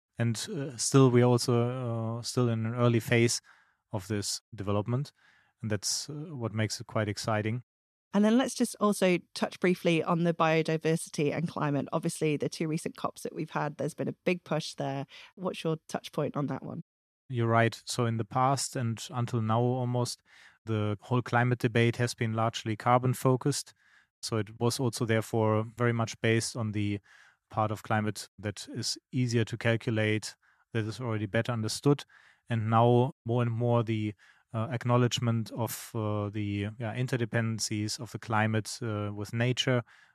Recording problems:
none

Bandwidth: 13.5 kHz